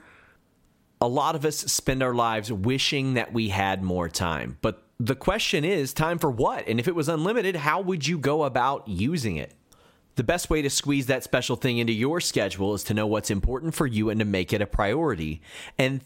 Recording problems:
squashed, flat; somewhat

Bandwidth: 16 kHz